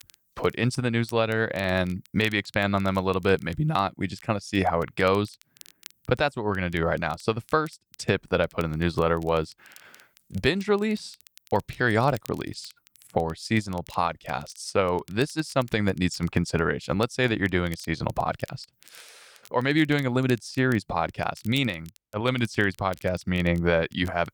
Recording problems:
crackle, like an old record; faint; 25 dB below the speech

